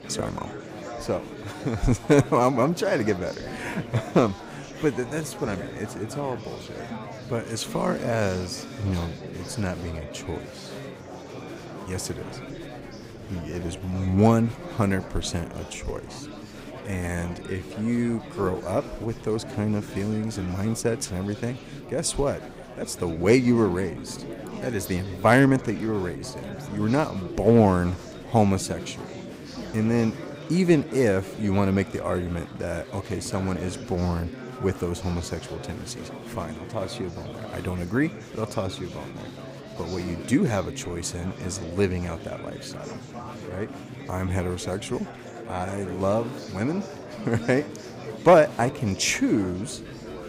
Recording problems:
murmuring crowd; noticeable; throughout; 10 dB below the speech

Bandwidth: 15.5 kHz